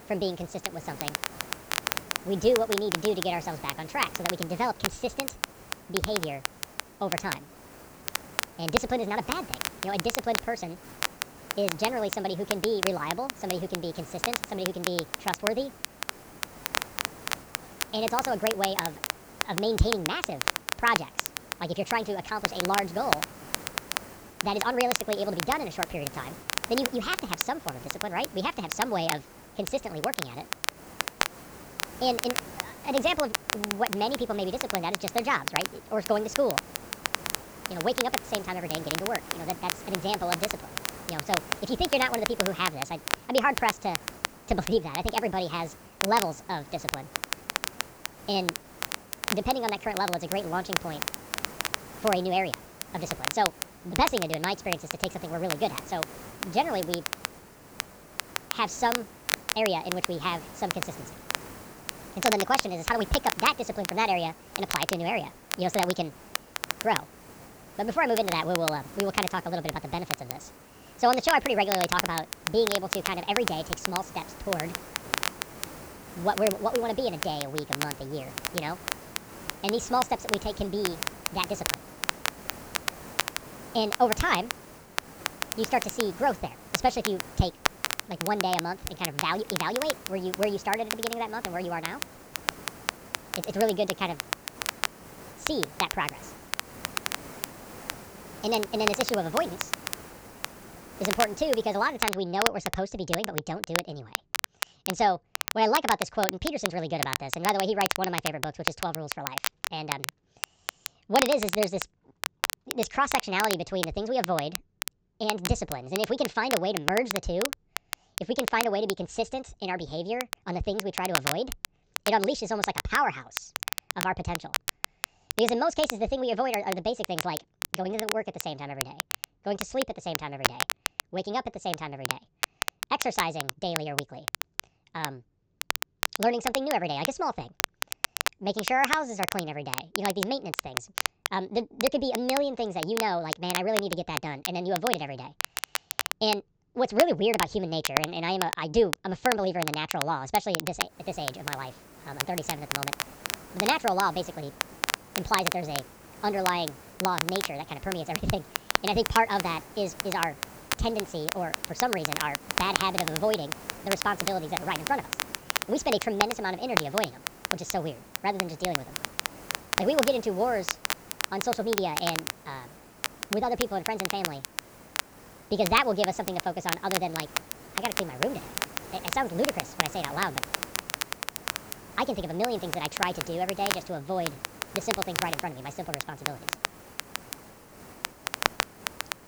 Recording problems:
wrong speed and pitch; too fast and too high; 1.5 times normal speed
high frequencies cut off; noticeable; nothing above 8 kHz
crackle, like an old record; loud; 3 dB below the speech
hiss; noticeable; until 1:42 and from 2:31 on; 15 dB below the speech

